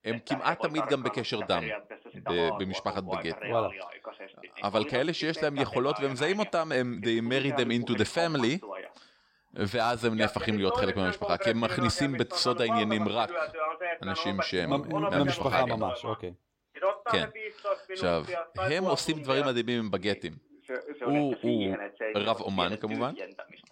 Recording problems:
voice in the background; loud; throughout; 5 dB below the speech

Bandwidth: 16 kHz